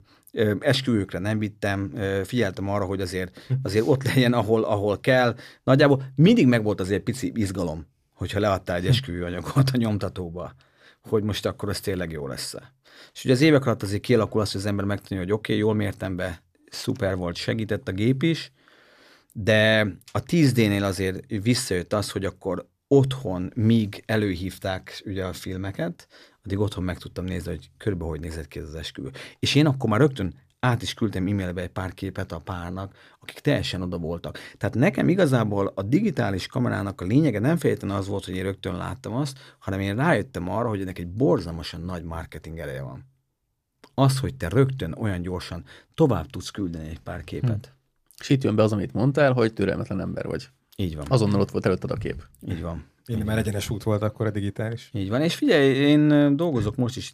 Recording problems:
none

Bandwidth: 14.5 kHz